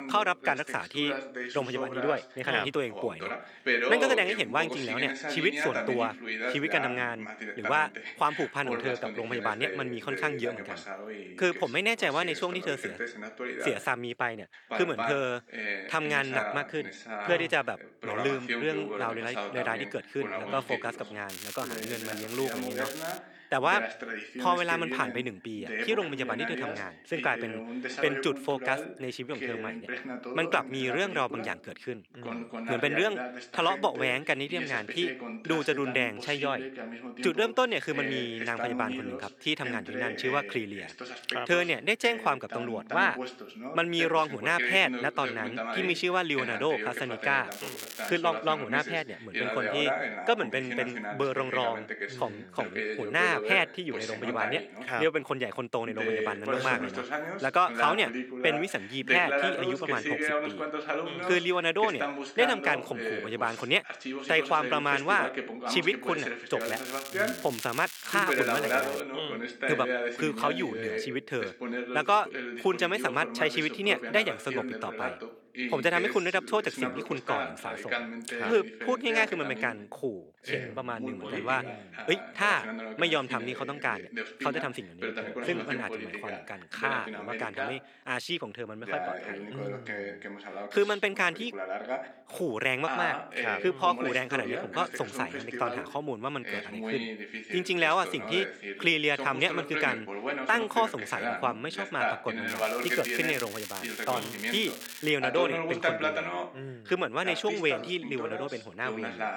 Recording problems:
thin; somewhat; fading below 300 Hz
voice in the background; loud; throughout; 5 dB below the speech
crackling; loud; 4 times, first at 21 s; 10 dB below the speech

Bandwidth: 18.5 kHz